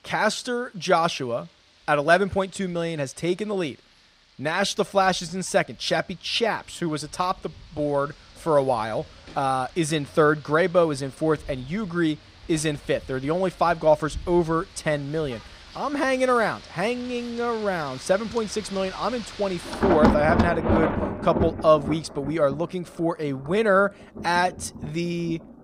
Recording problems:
rain or running water; loud; throughout; 5 dB below the speech

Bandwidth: 15.5 kHz